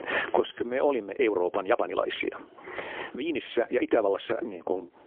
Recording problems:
phone-call audio; poor line; nothing above 3.5 kHz
squashed, flat; heavily
uneven, jittery; strongly

